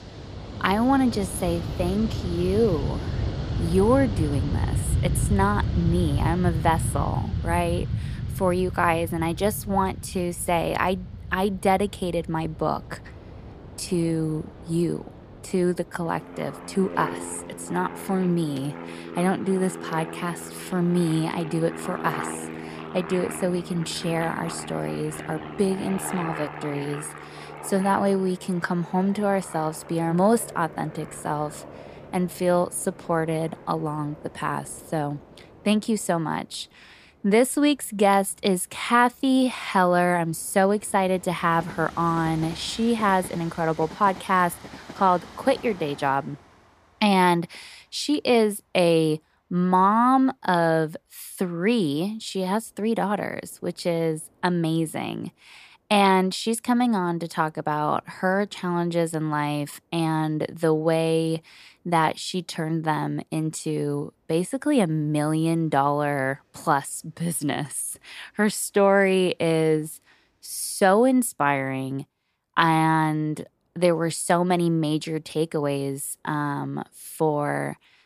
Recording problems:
train or aircraft noise; loud; throughout; 9 dB below the speech

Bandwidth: 14.5 kHz